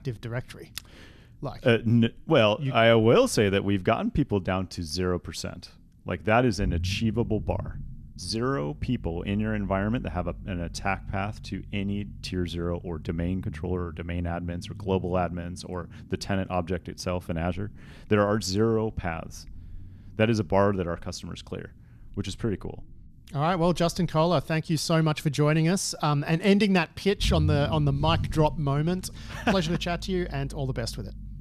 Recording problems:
low rumble; faint; throughout; 25 dB below the speech

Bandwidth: 14 kHz